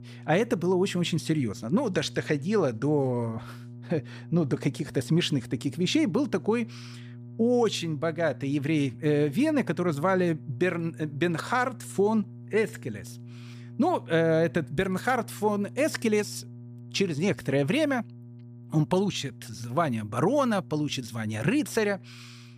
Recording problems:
electrical hum; faint; throughout; 60 Hz, 25 dB below the speech

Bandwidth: 15 kHz